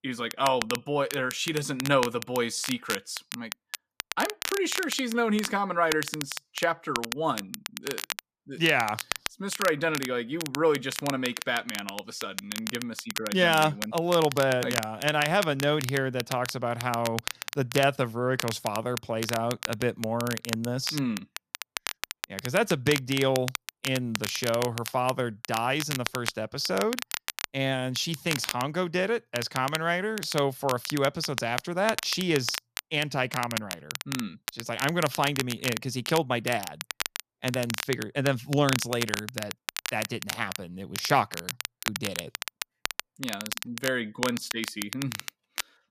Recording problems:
crackle, like an old record; loud; 7 dB below the speech

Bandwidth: 14.5 kHz